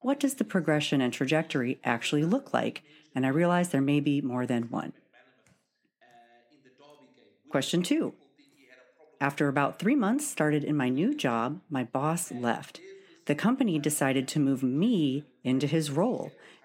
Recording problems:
voice in the background; faint; throughout; 30 dB below the speech

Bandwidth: 16.5 kHz